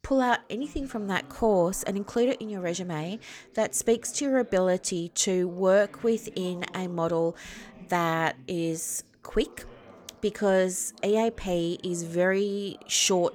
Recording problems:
background chatter; faint; throughout; 2 voices, 25 dB below the speech

